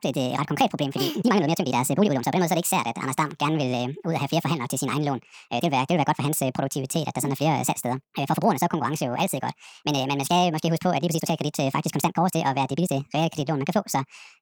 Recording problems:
wrong speed and pitch; too fast and too high; 1.6 times normal speed
uneven, jittery; strongly; from 1 to 13 s

